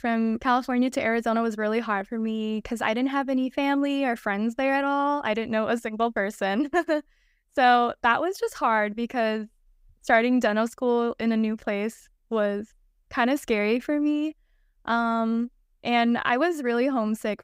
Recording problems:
none

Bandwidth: 15.5 kHz